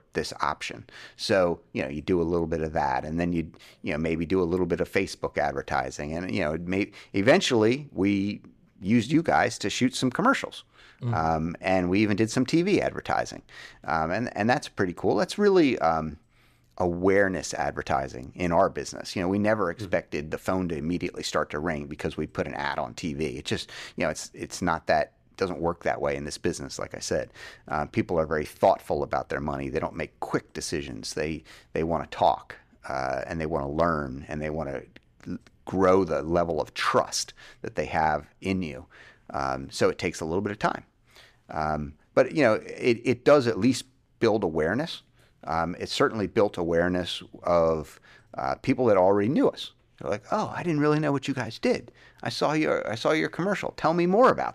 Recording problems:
none

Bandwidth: 14.5 kHz